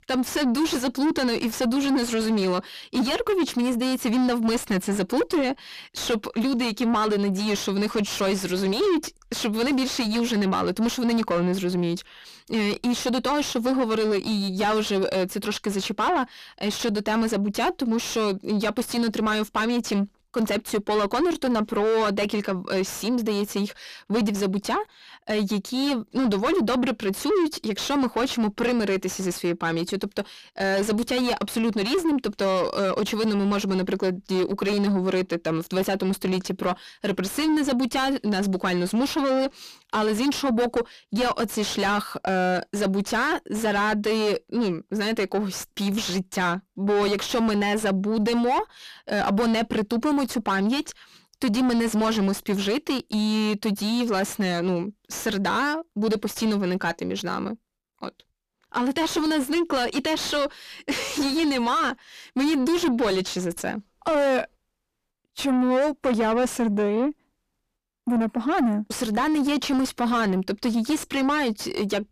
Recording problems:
distortion; heavy; 5 dB below the speech

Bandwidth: 14.5 kHz